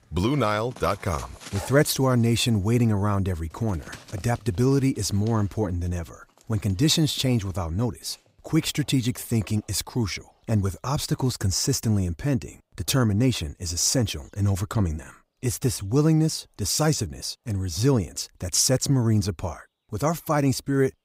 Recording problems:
animal sounds; faint; throughout; 20 dB below the speech

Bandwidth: 15.5 kHz